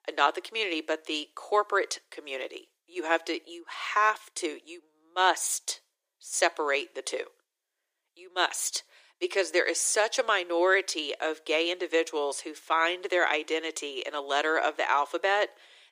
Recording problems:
thin; very; fading below 350 Hz

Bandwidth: 15 kHz